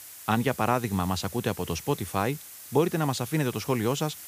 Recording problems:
hiss; noticeable; throughout; 15 dB below the speech

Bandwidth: 15 kHz